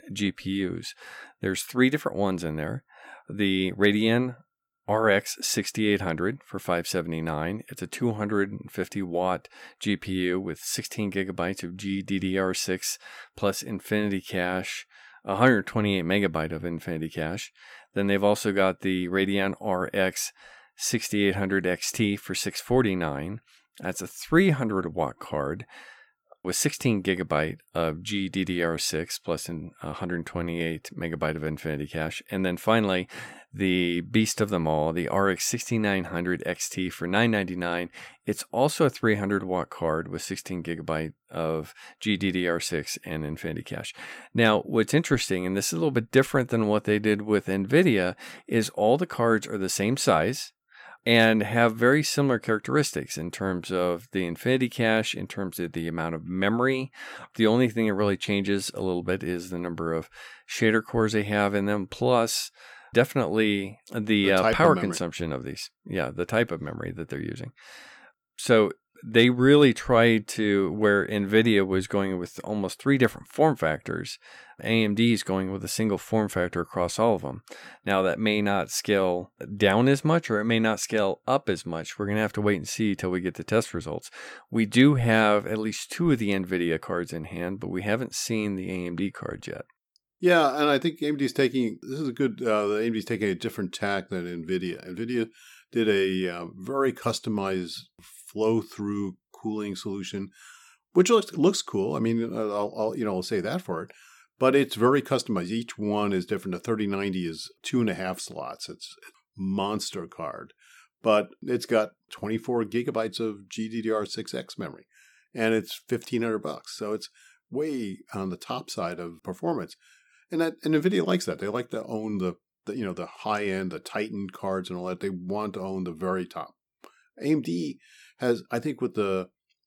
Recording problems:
none

